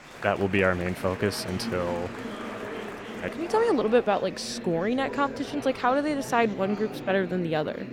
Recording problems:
murmuring crowd; noticeable; throughout; 10 dB below the speech

